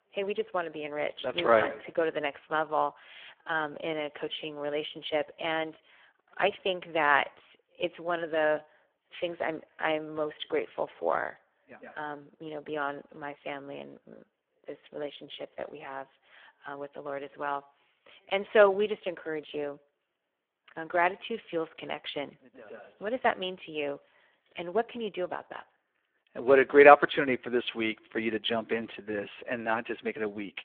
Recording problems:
phone-call audio; poor line; nothing above 3.5 kHz

